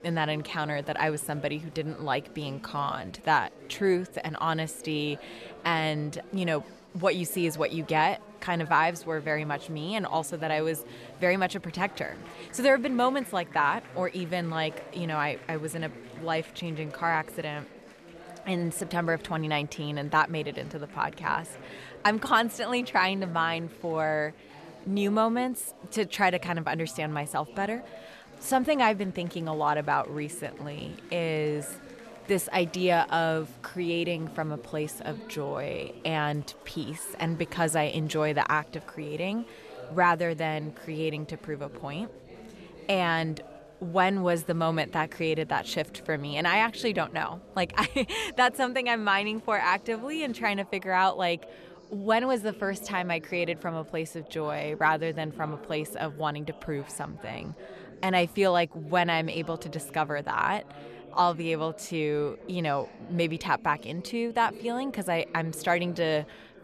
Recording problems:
chatter from many people; noticeable; throughout; 20 dB below the speech

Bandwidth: 13.5 kHz